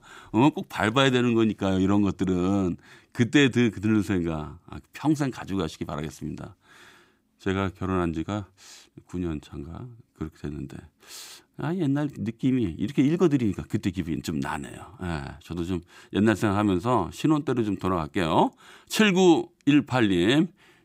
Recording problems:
none

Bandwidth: 15.5 kHz